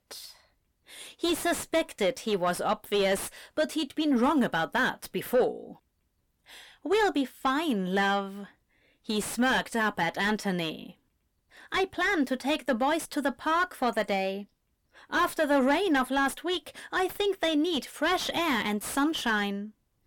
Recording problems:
distortion; heavy; 7 dB below the speech

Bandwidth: 17 kHz